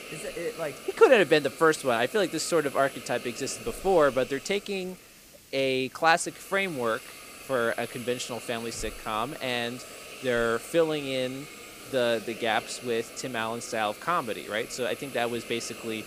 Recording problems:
hiss; noticeable; throughout; 15 dB below the speech

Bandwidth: 15 kHz